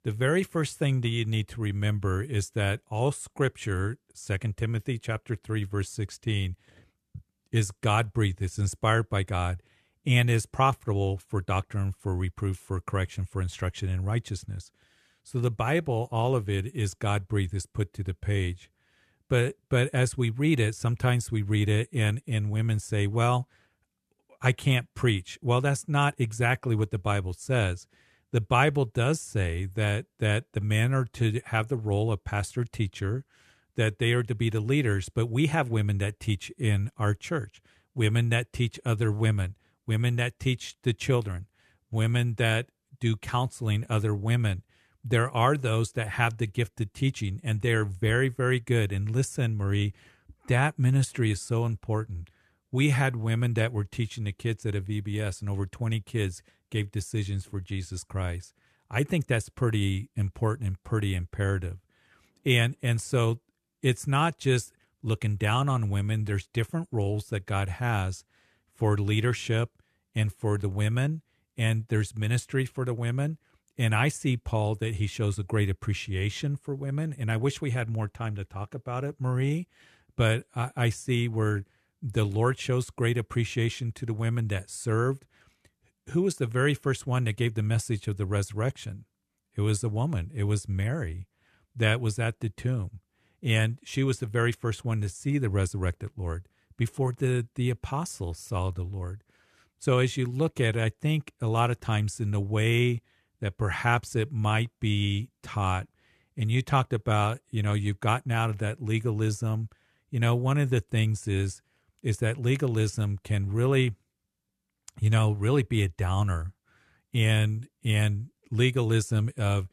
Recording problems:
none

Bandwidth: 13.5 kHz